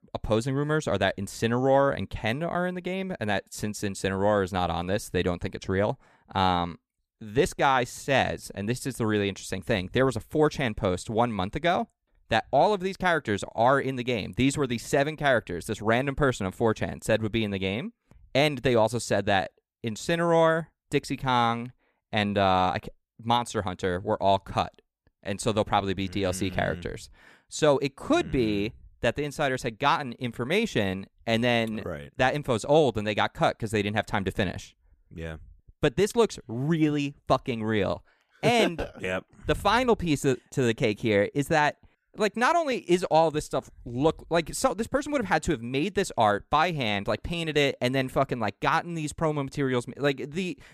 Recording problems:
none

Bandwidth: 14.5 kHz